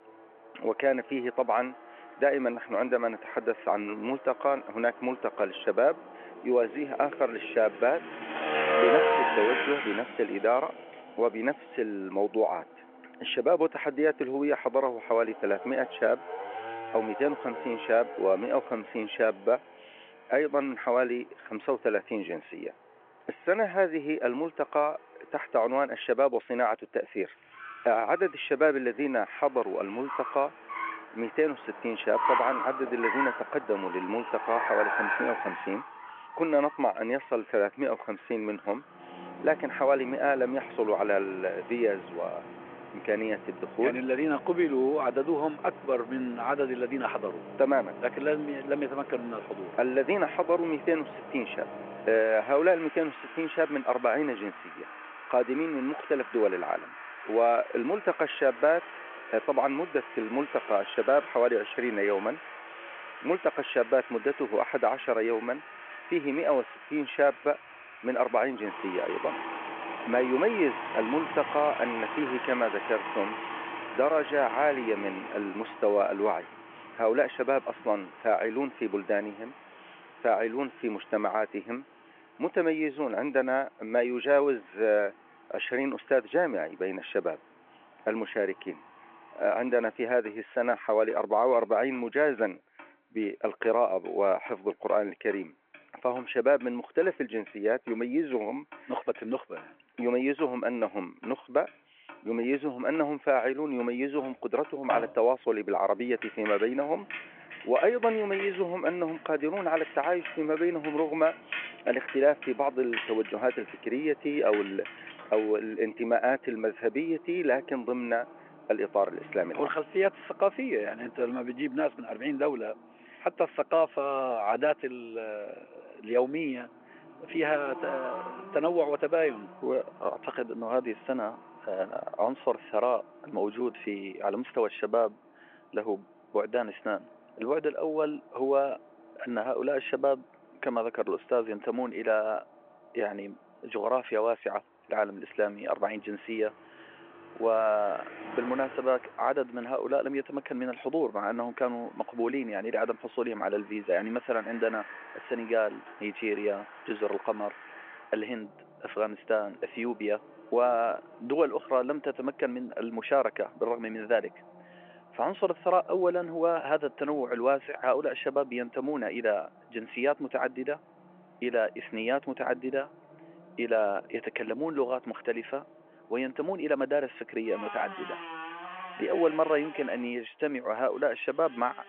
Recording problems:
phone-call audio
traffic noise; loud; throughout; 9 dB below the speech

